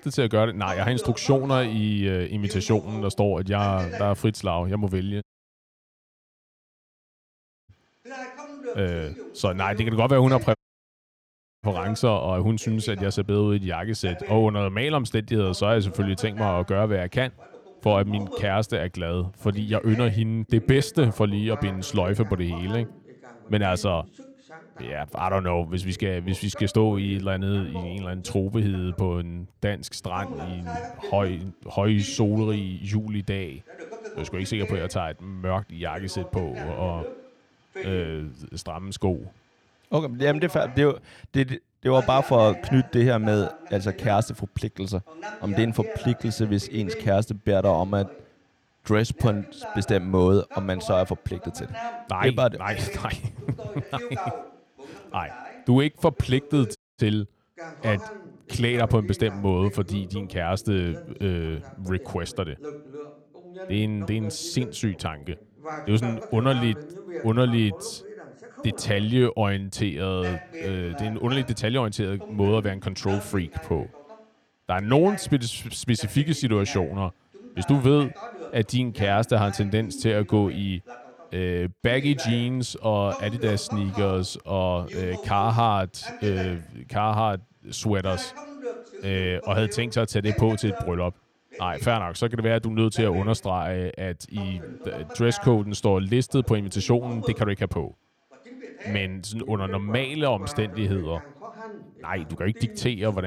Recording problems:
voice in the background; noticeable; throughout; 15 dB below the speech
audio cutting out; at 5 s for 2.5 s, at 11 s for 1 s and at 57 s
abrupt cut into speech; at the end

